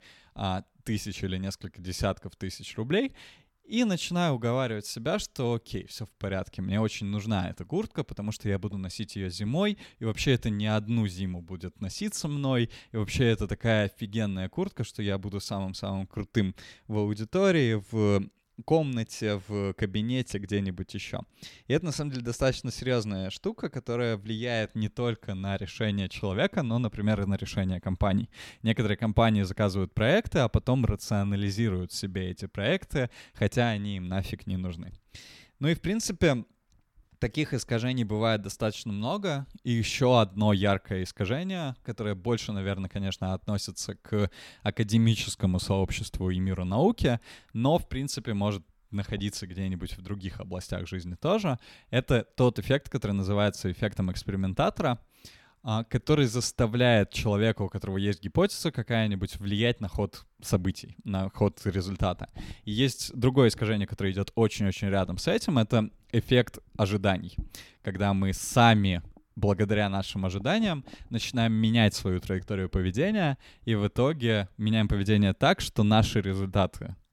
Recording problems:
none

